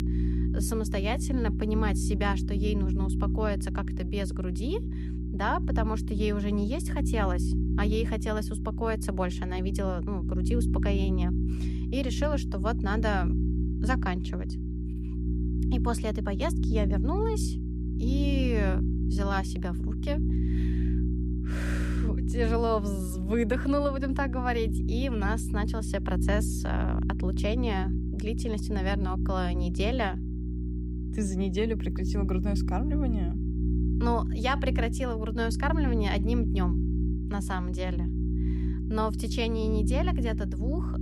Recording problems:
electrical hum; loud; throughout; 60 Hz, 7 dB below the speech

